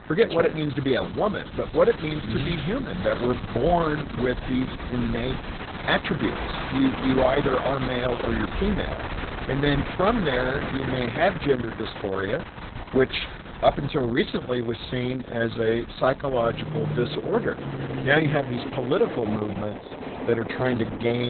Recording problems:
garbled, watery; badly; nothing above 4 kHz
train or aircraft noise; loud; throughout; 9 dB below the speech
abrupt cut into speech; at the end

